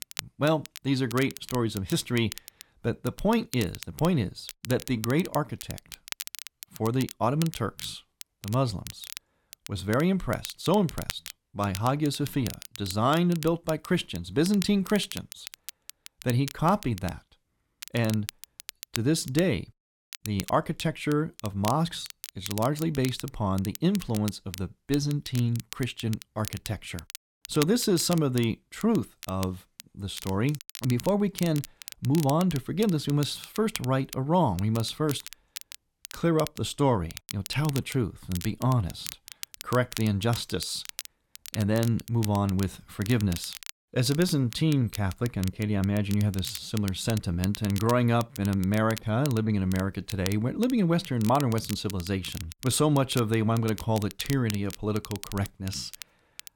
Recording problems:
crackle, like an old record; noticeable; 15 dB below the speech

